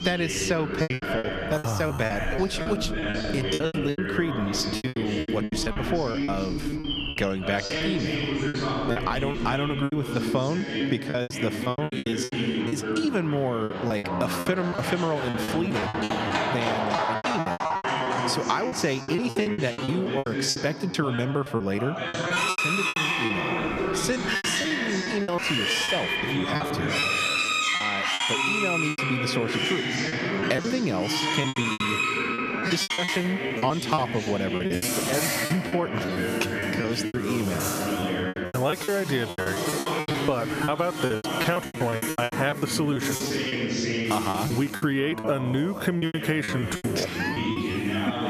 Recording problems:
squashed, flat; somewhat
animal sounds; loud; throughout; as loud as the speech
voice in the background; loud; throughout; 2 dB below the speech
choppy; very; 16% of the speech affected

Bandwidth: 14.5 kHz